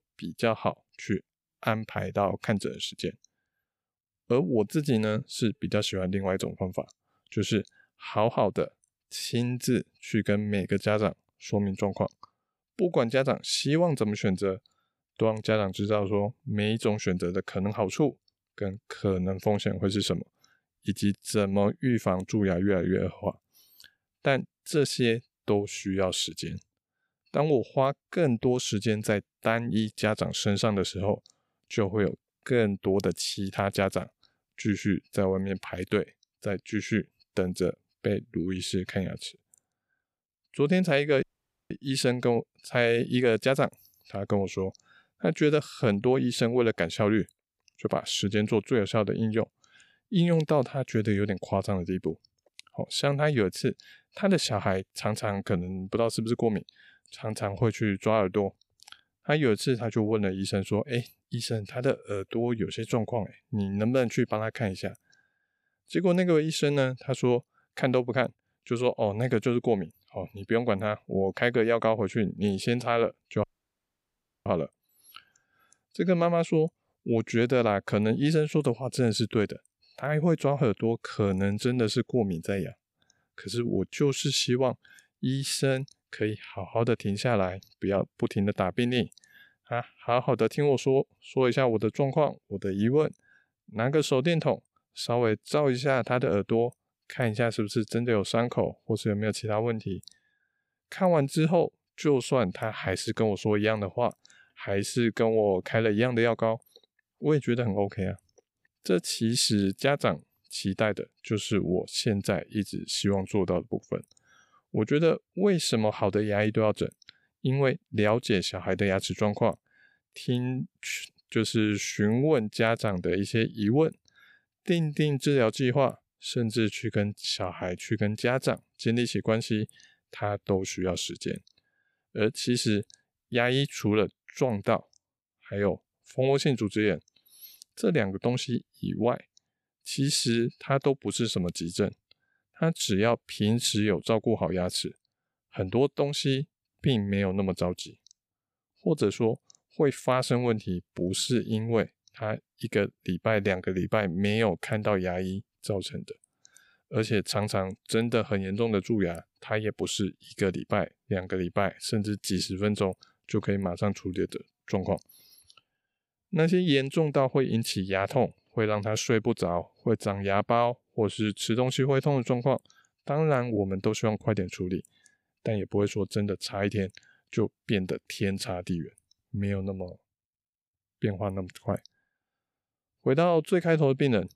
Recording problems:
audio cutting out; at 41 s and at 1:13 for 1 s

